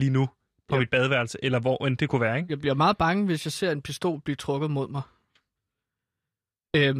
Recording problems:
abrupt cut into speech; at the start and the end

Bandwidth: 14.5 kHz